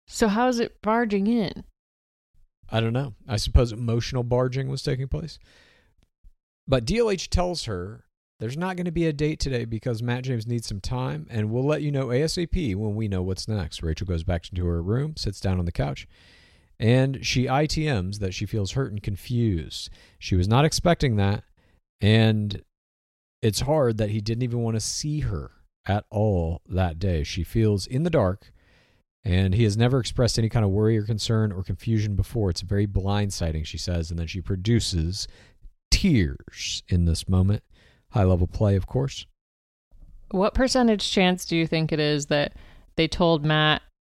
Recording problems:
none

